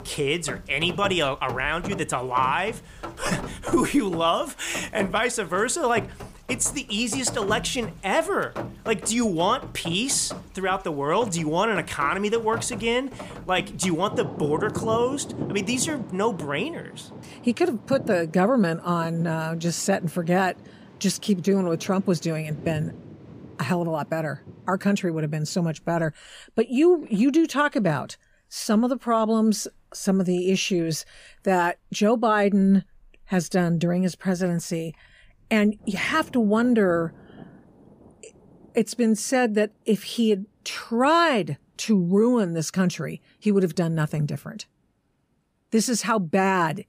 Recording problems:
rain or running water; noticeable; throughout; 15 dB below the speech

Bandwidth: 15 kHz